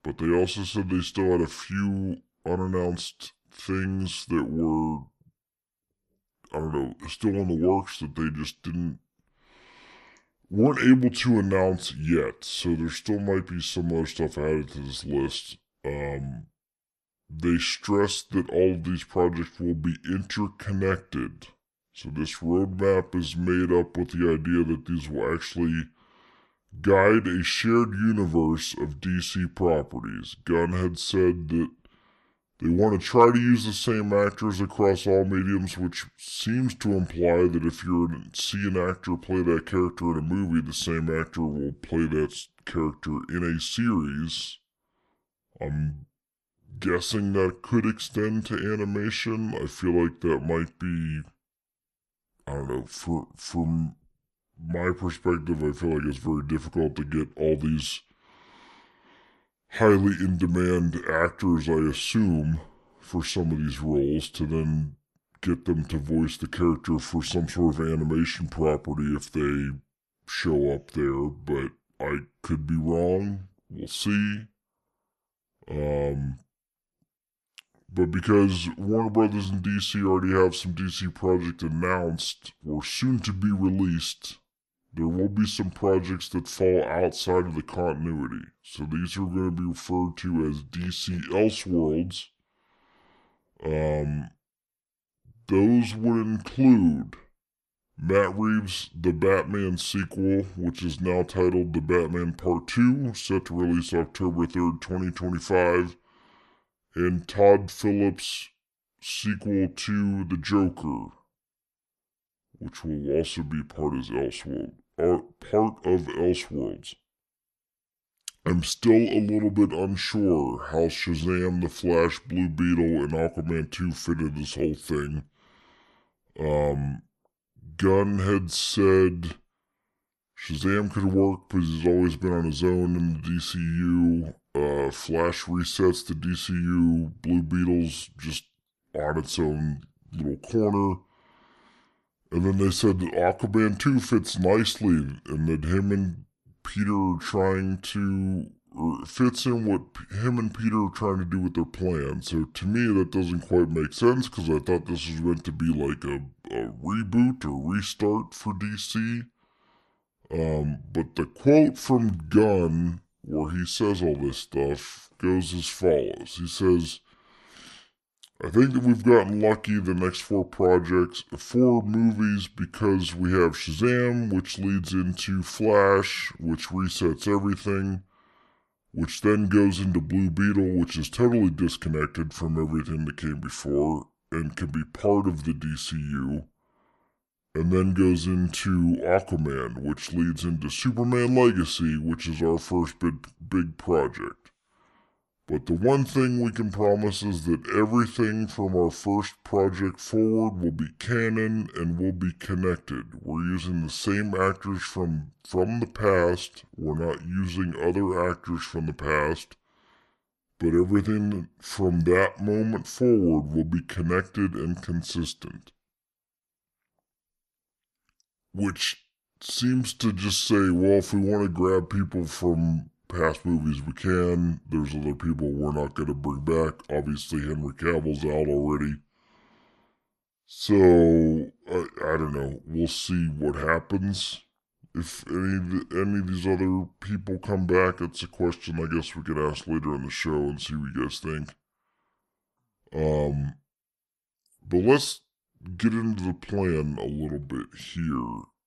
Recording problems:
wrong speed and pitch; too slow and too low; 0.7 times normal speed

